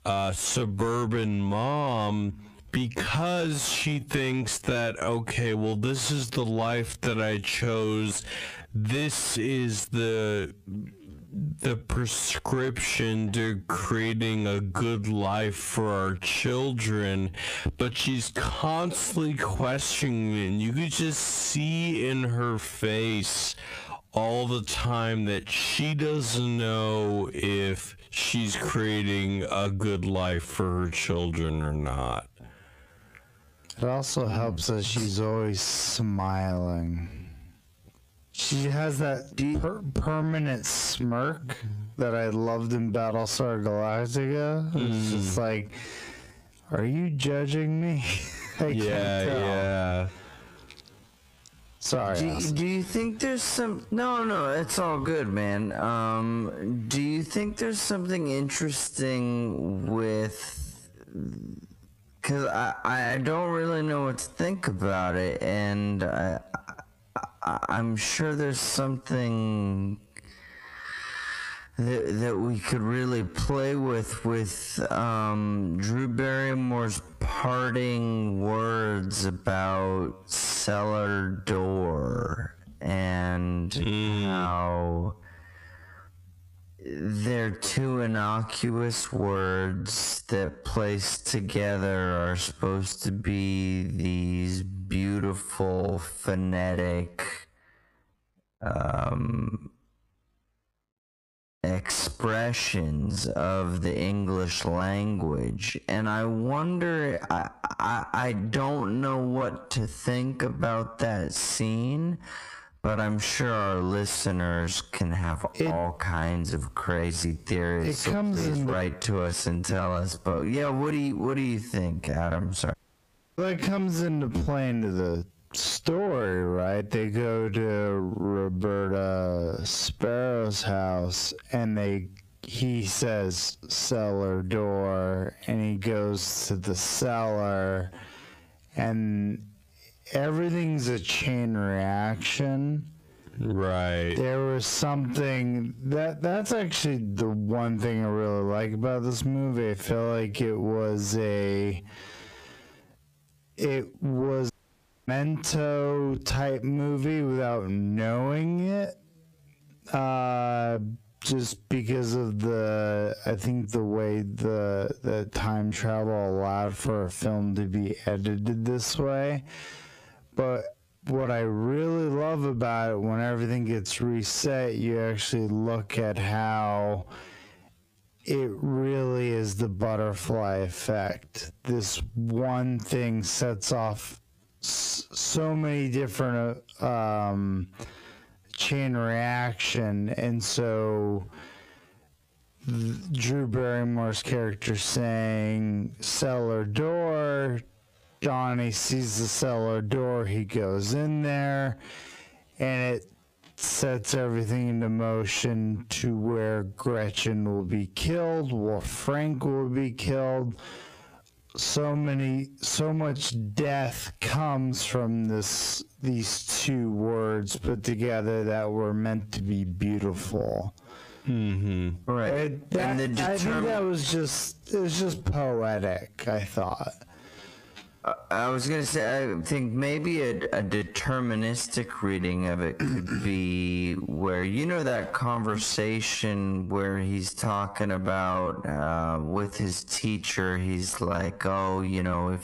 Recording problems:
squashed, flat; heavily
wrong speed, natural pitch; too slow; 0.5 times normal speed
distortion; slight; 10 dB below the speech
audio cutting out; at 2:03 for 0.5 s and at 2:35 for 0.5 s

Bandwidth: 15 kHz